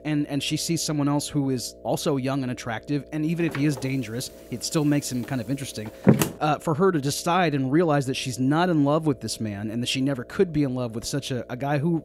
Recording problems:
electrical hum; faint; throughout; 60 Hz, 20 dB below the speech
door banging; loud; from 3.5 to 6.5 s; peak 5 dB above the speech

